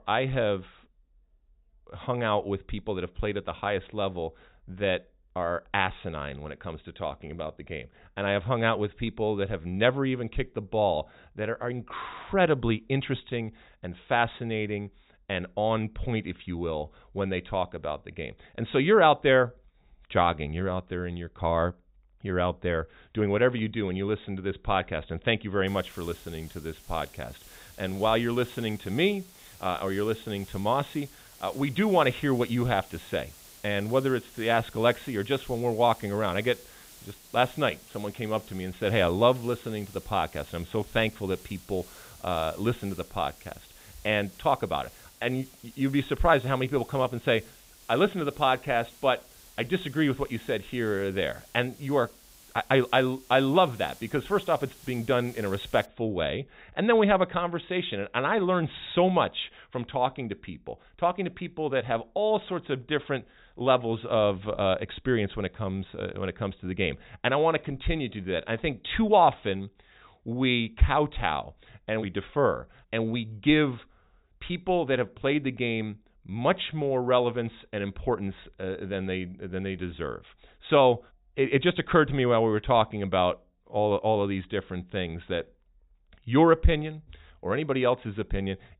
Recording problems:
high frequencies cut off; severe; nothing above 4 kHz
hiss; faint; from 26 to 56 s; 20 dB below the speech

